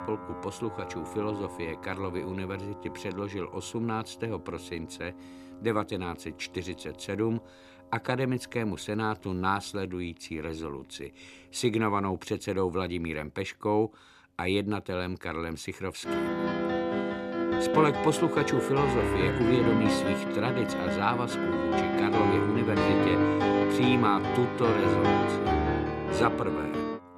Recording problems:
background music; very loud; throughout; 3 dB above the speech

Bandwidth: 14 kHz